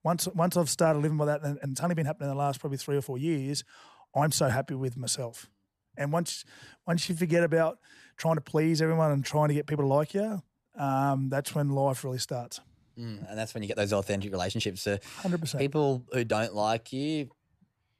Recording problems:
uneven, jittery; strongly; from 1.5 to 17 s

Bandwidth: 14.5 kHz